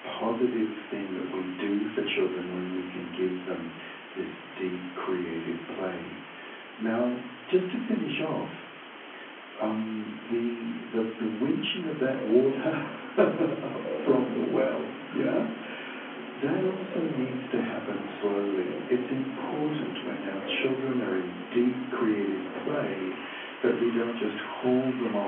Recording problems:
off-mic speech; far
room echo; slight; dies away in 0.5 s
phone-call audio; nothing above 3.5 kHz
rain or running water; noticeable; from 12 s on; 10 dB below the speech
hiss; noticeable; throughout; 15 dB below the speech
abrupt cut into speech; at the end

